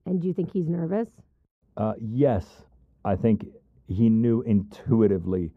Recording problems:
muffled; very; fading above 1 kHz

